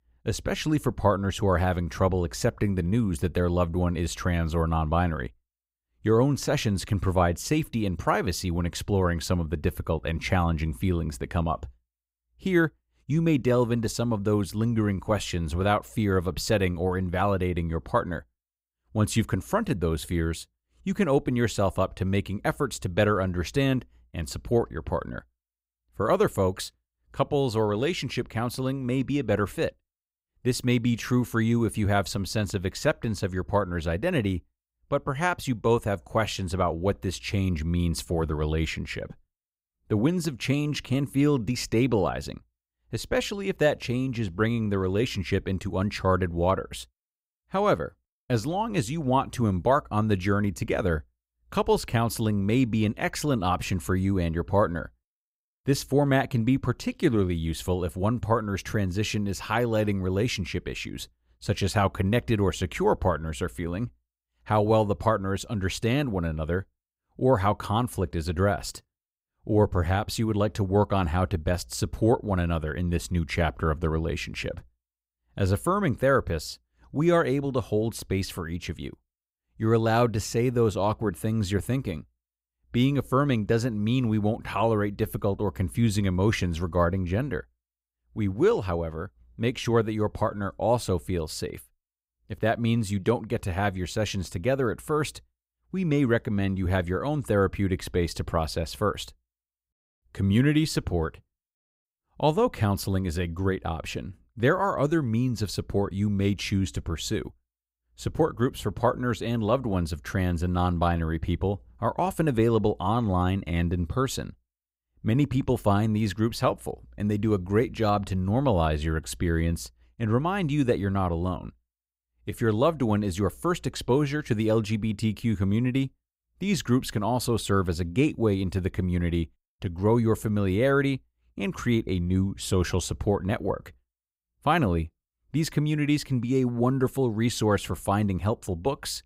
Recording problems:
none

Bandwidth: 15.5 kHz